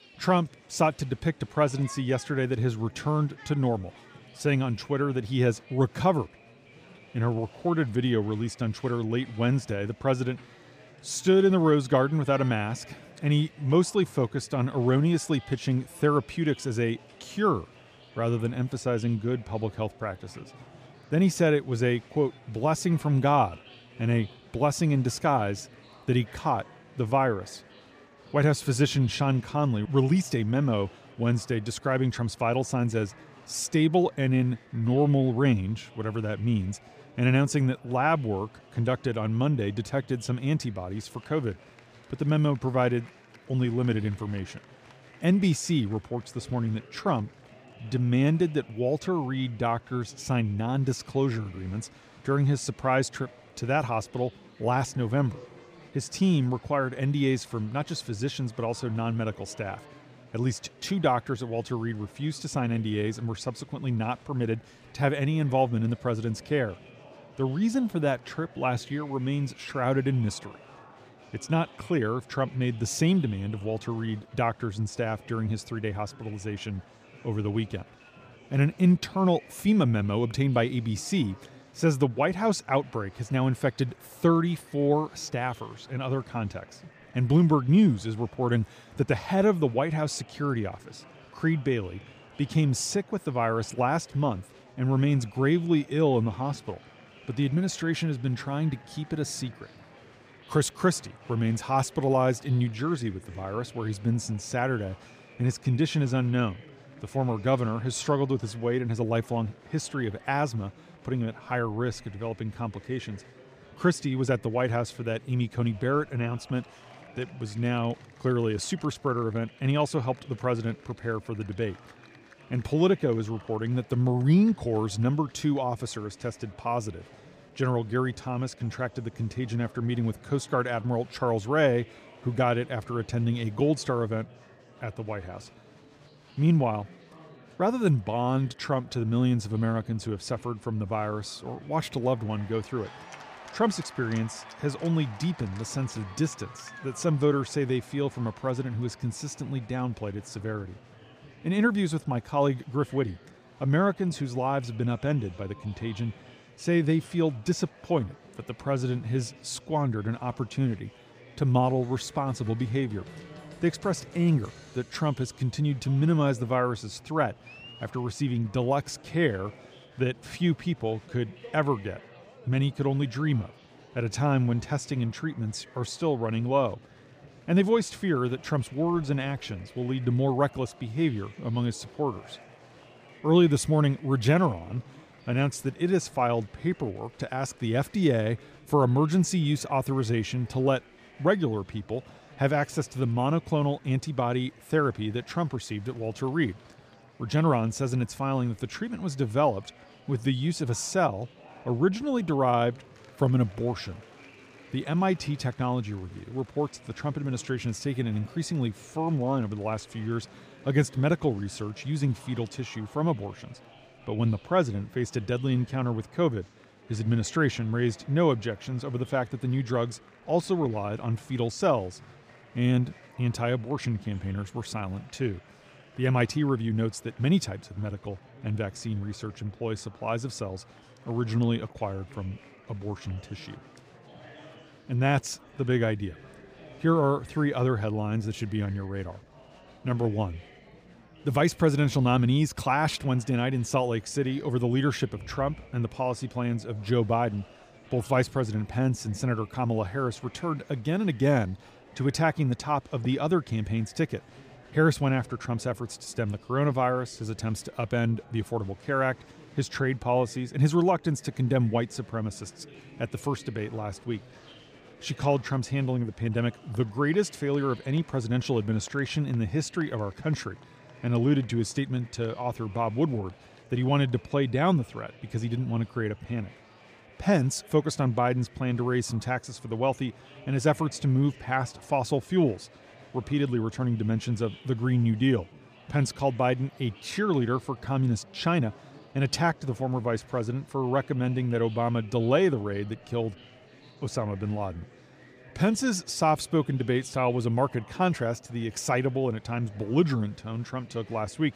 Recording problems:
murmuring crowd; faint; throughout; 25 dB below the speech

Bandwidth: 15 kHz